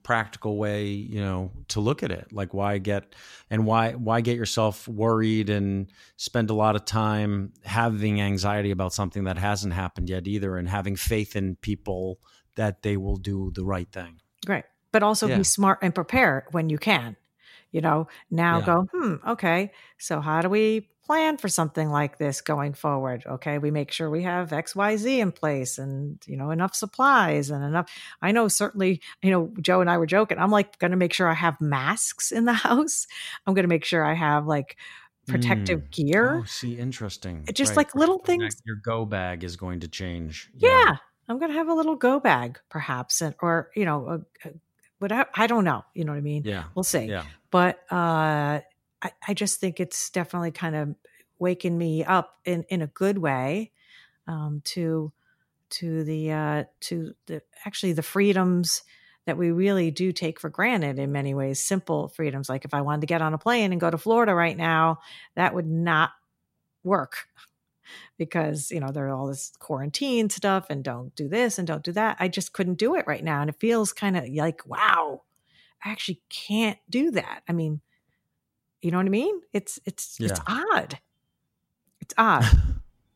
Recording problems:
none

